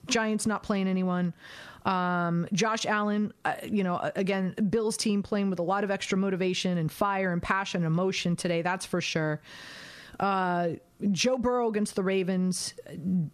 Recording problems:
squashed, flat; somewhat

